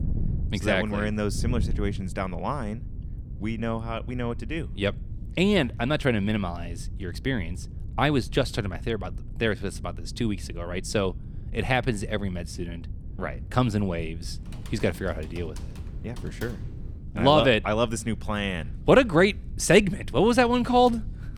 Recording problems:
wind noise on the microphone; occasional gusts; 25 dB below the speech
keyboard typing; faint; from 14 to 17 s; peak 20 dB below the speech

